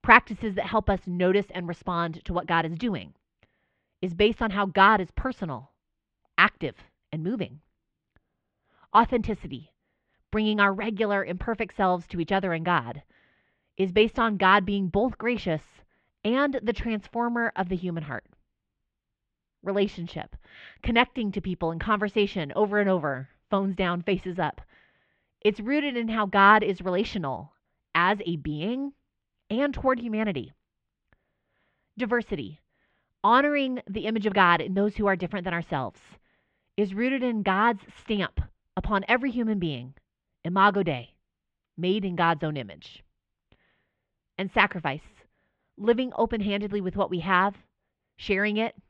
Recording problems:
muffled; slightly; fading above 3 kHz

